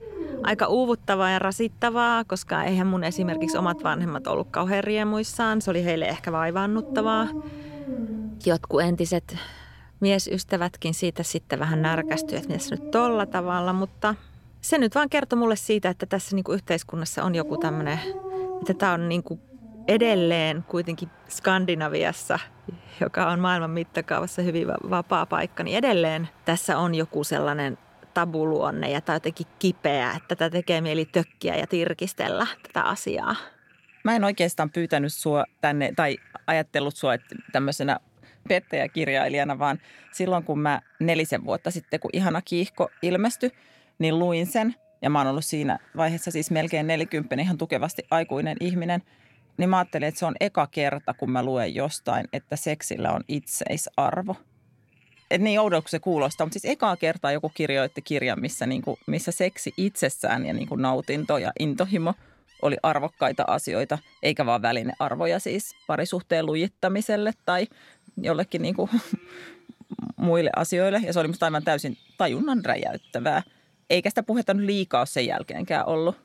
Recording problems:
animal sounds; noticeable; throughout; 15 dB below the speech

